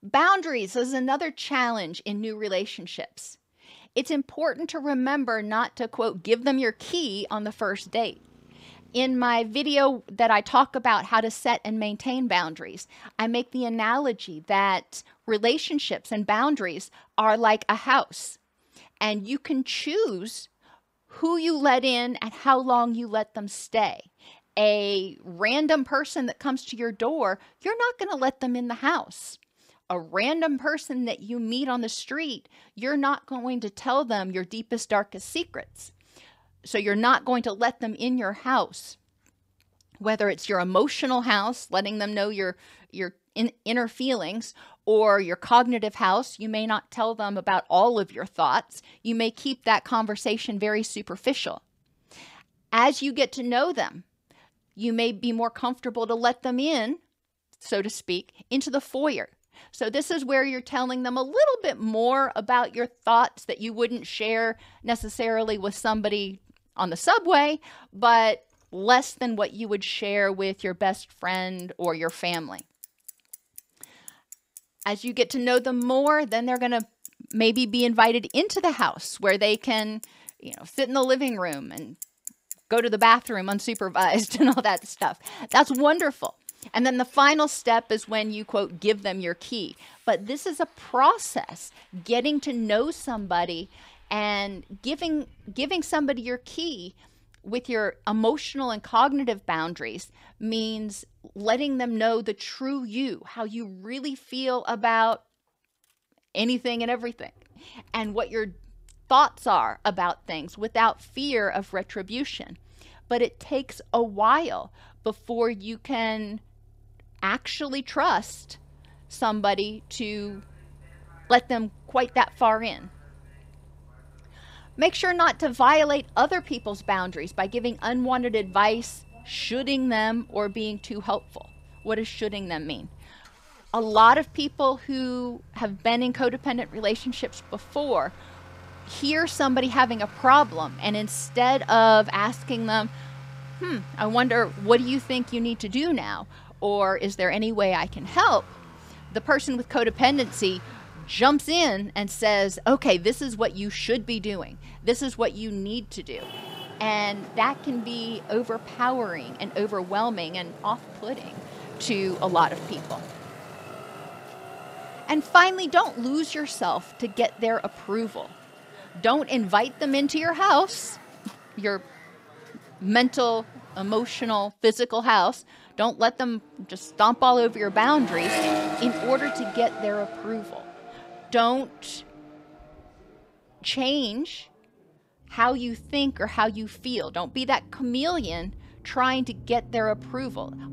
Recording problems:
traffic noise; noticeable; throughout; 15 dB below the speech

